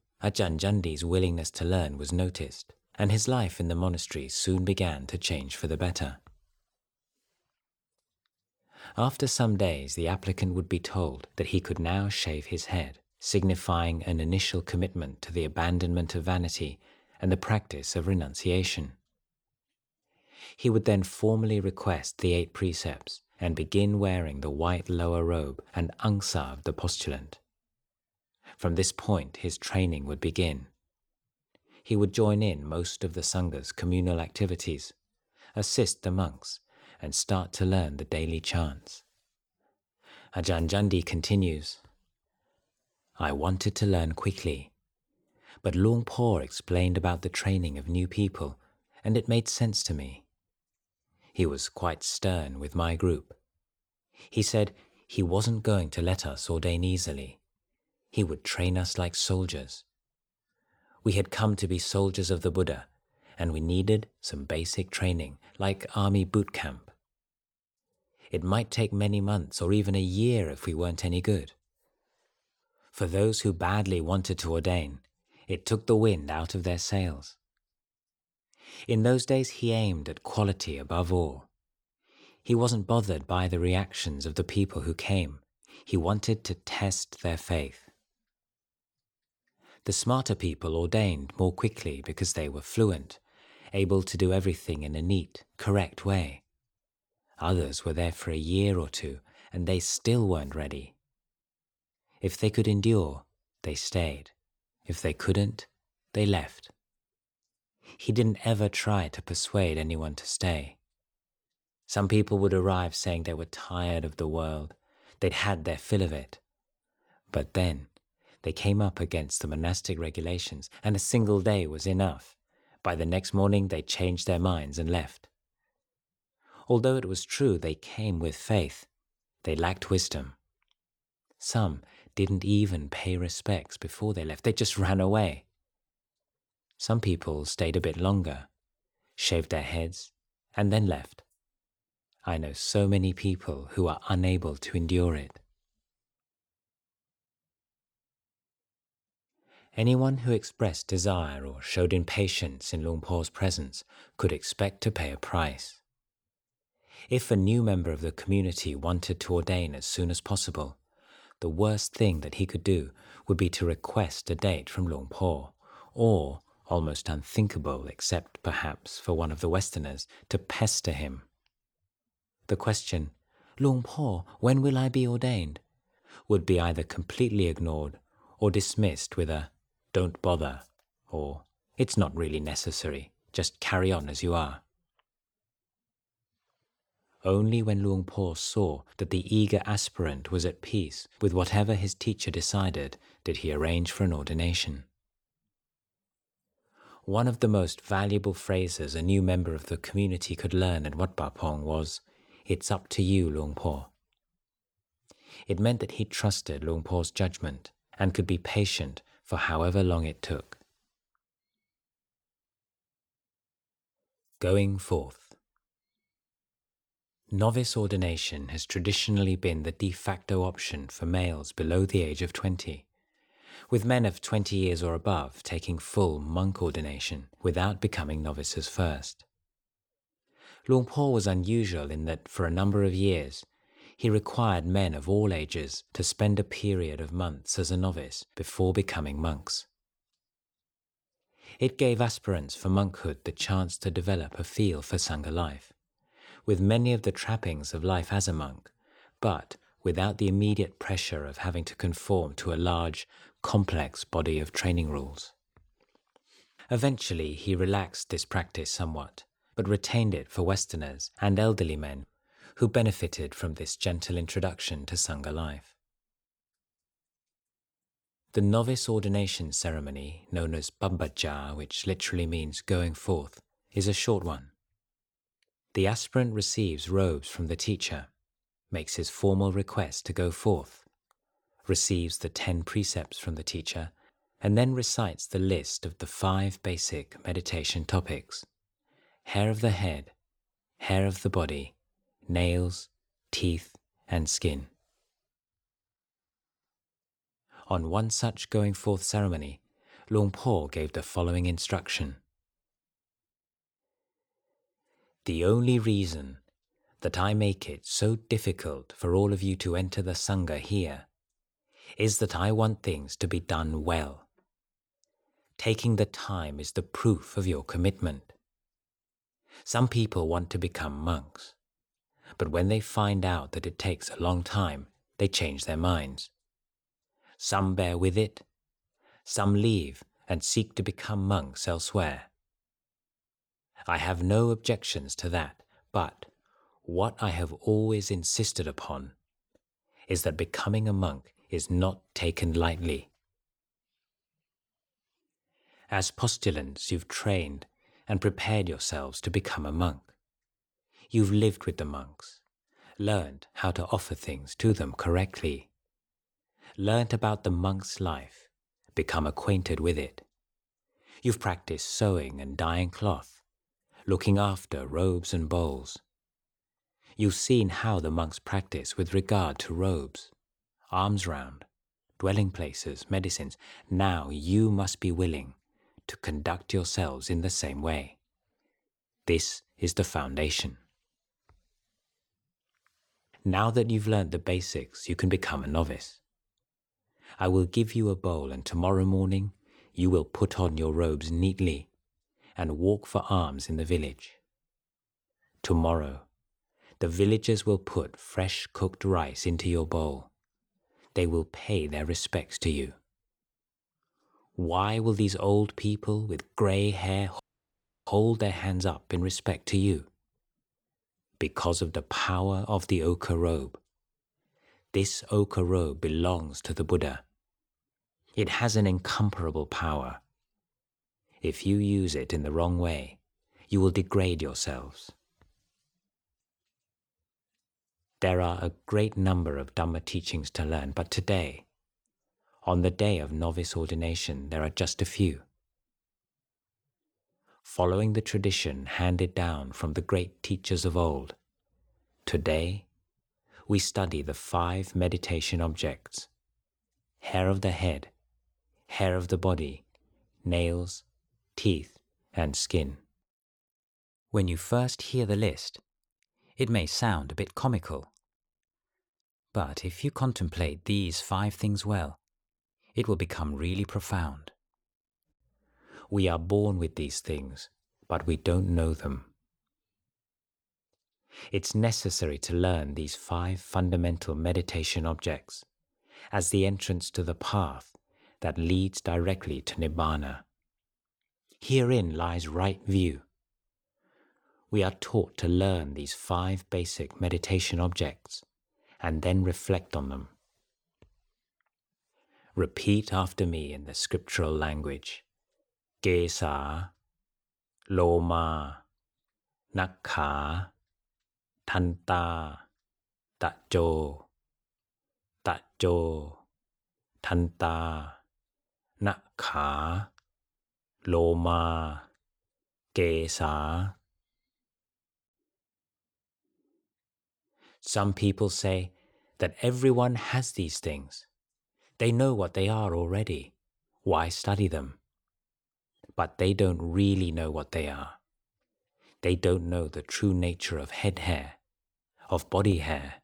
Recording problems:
audio cutting out; at 6:47 for 0.5 s

